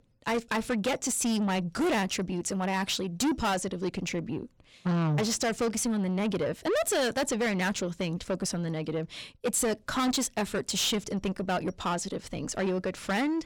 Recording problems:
distortion; heavy; 7 dB below the speech

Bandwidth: 17.5 kHz